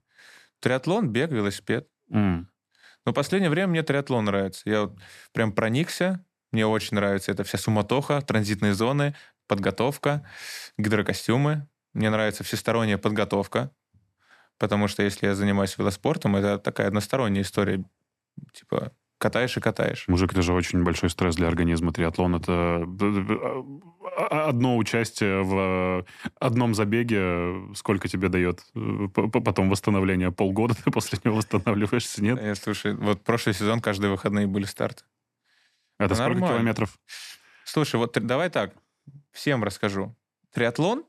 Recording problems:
none

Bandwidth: 14 kHz